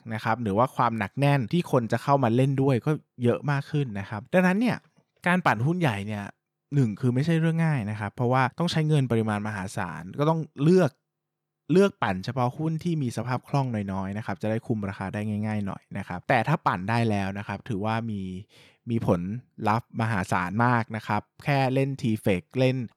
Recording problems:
none

